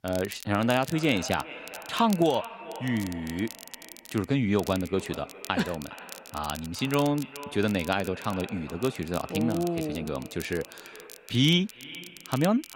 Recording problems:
echo of what is said; noticeable; throughout; 410 ms later, 15 dB below the speech
crackle, like an old record; noticeable; 15 dB below the speech

